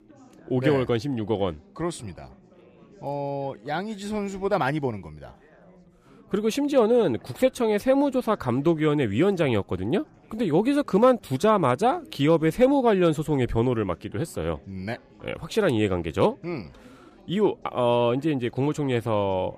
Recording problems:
chatter from many people; faint; throughout; 30 dB below the speech

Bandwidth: 15 kHz